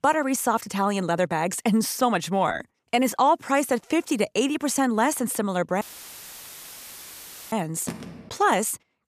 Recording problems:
audio cutting out; filled with static; at 6 s for 1.5 s
phone ringing; faint; at 8 s; peak 10 dB below the speech

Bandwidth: 14.5 kHz